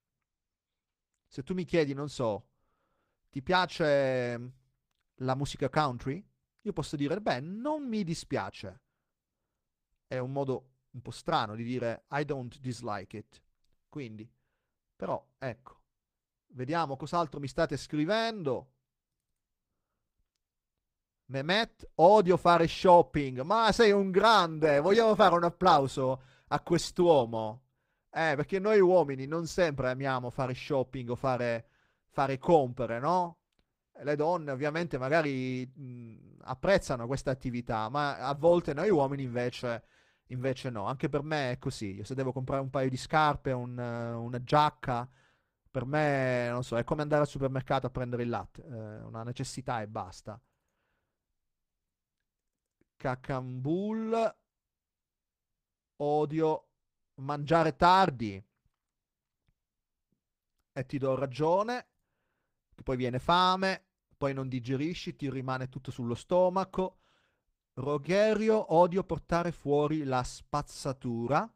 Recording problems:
garbled, watery; slightly; nothing above 15.5 kHz

